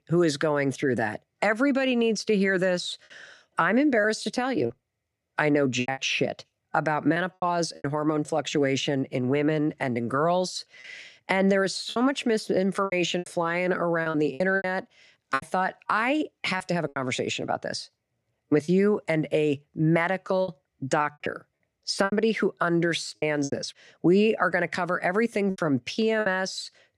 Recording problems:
choppy; very; 7% of the speech affected

